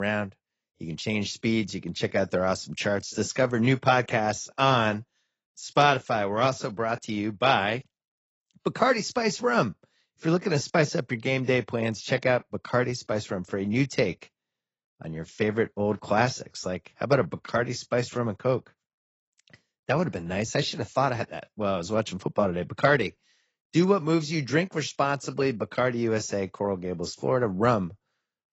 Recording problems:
garbled, watery; badly; nothing above 7.5 kHz
abrupt cut into speech; at the start

